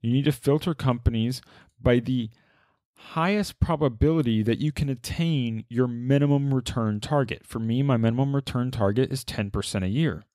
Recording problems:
none

